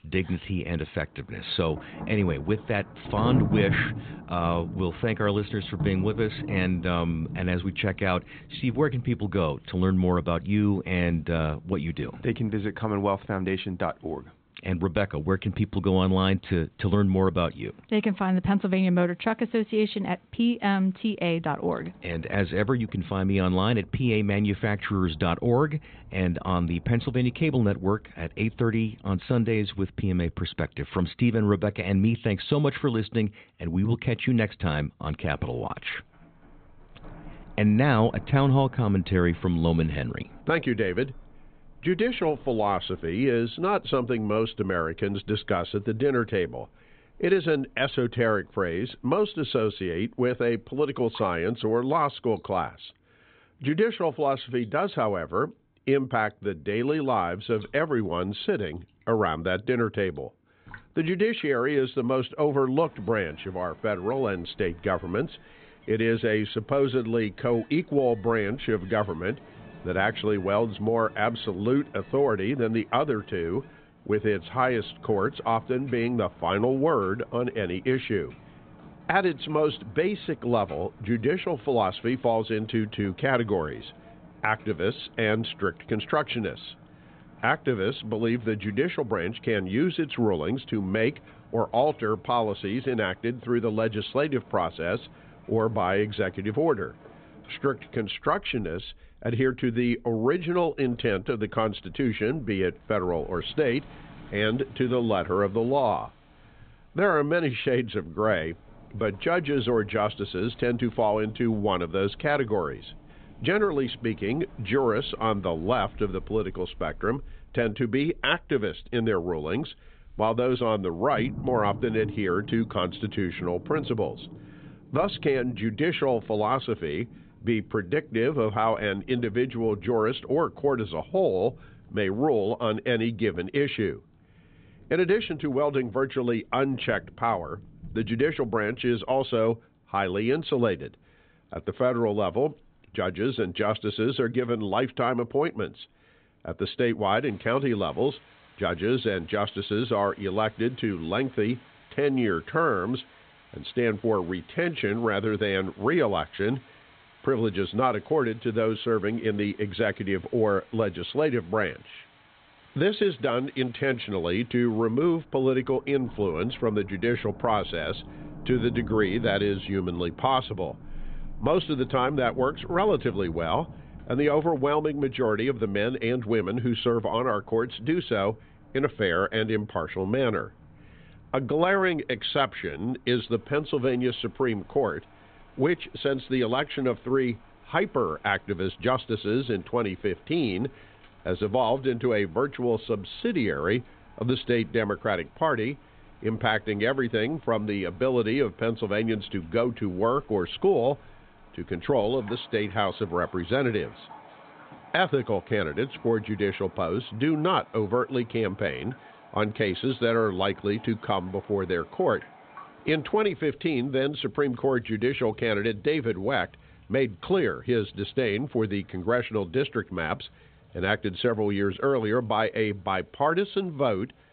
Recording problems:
high frequencies cut off; severe; nothing above 4 kHz
rain or running water; noticeable; throughout; 20 dB below the speech

